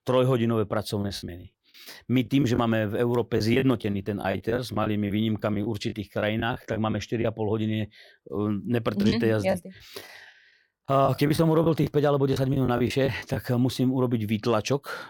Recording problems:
choppy; very; from 1 to 2.5 s, from 3.5 to 7 s and from 9 to 13 s; 12% of the speech affected

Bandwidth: 17.5 kHz